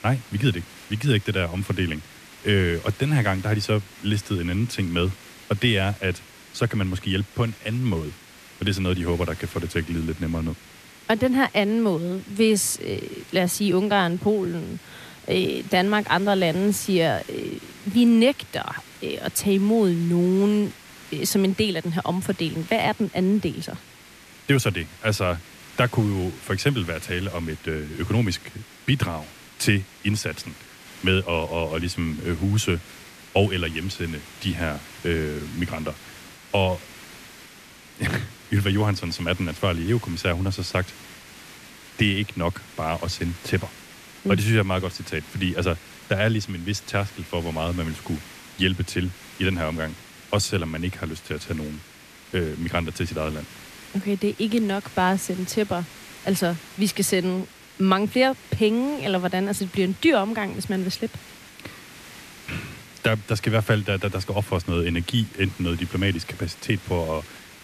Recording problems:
hiss; noticeable; throughout; 20 dB below the speech

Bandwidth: 14.5 kHz